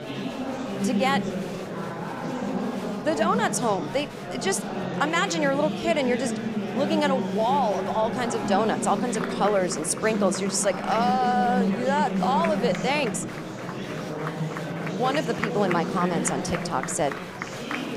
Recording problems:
murmuring crowd; loud; throughout; 4 dB below the speech

